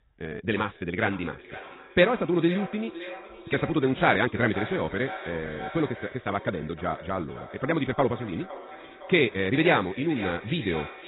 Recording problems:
garbled, watery; badly; nothing above 4 kHz
wrong speed, natural pitch; too fast; 1.6 times normal speed
echo of what is said; noticeable; throughout; 510 ms later, 15 dB below the speech

